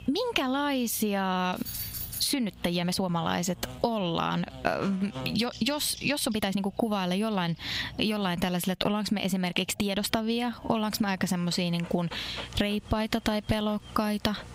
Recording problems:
squashed, flat; somewhat, background pumping
electrical hum; noticeable; until 8.5 s and from 10 s on; 60 Hz, 20 dB below the speech
animal sounds; faint; from 7 s on; 20 dB below the speech
jangling keys; noticeable; at 1.5 s; peak 5 dB below the speech
uneven, jittery; strongly; from 2 to 14 s

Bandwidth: 15.5 kHz